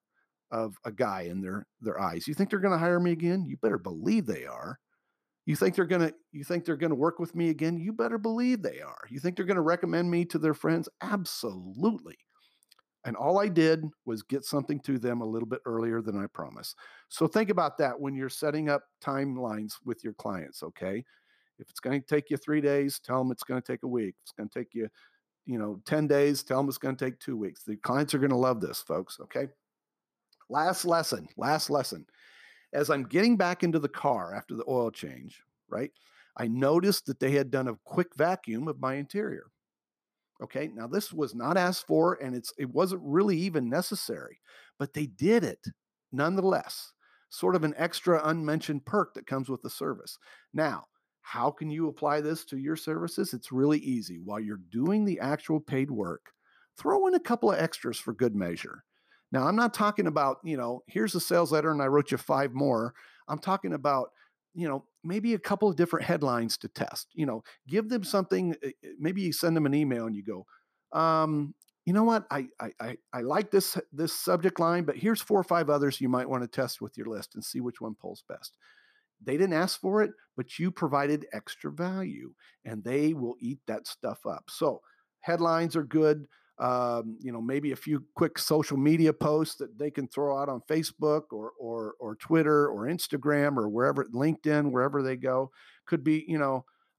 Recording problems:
none

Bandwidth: 14.5 kHz